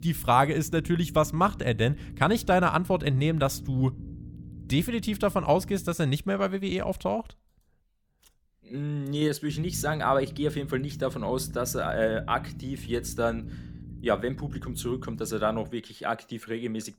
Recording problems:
low rumble; faint; until 6 s and from 9.5 to 16 s; 20 dB below the speech

